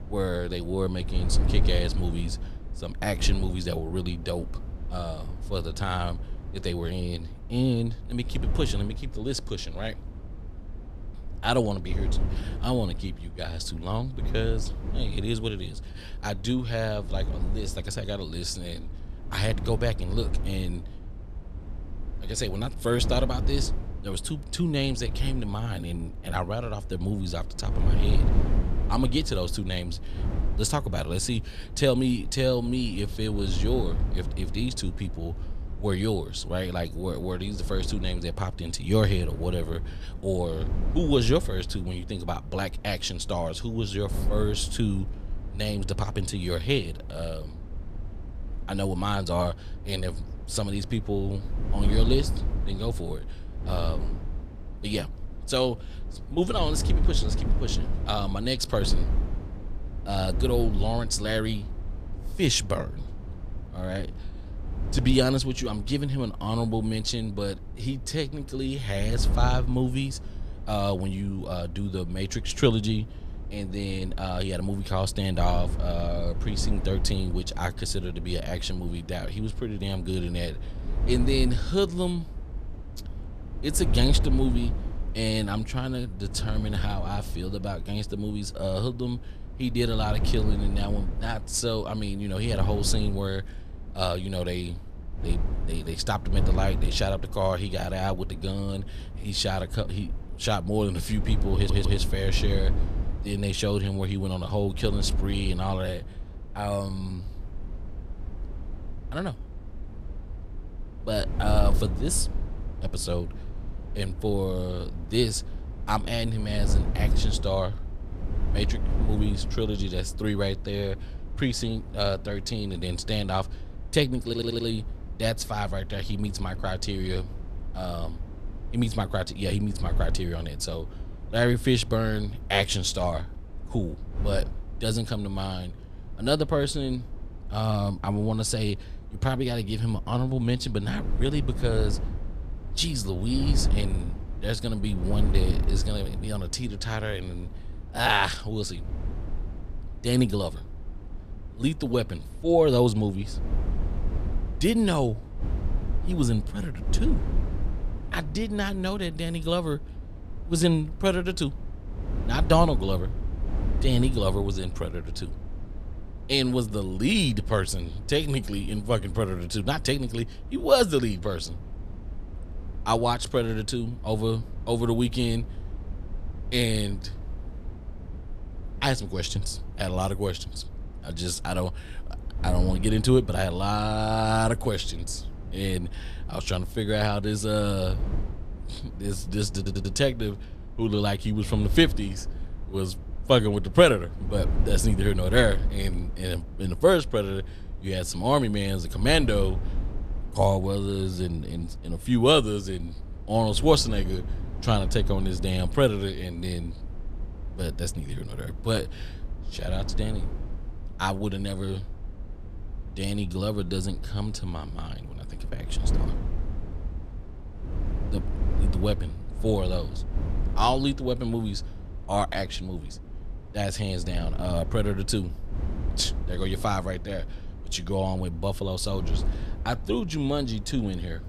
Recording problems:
wind noise on the microphone; occasional gusts; 15 dB below the speech
audio stuttering; at 1:42, at 2:04 and at 3:10

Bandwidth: 14.5 kHz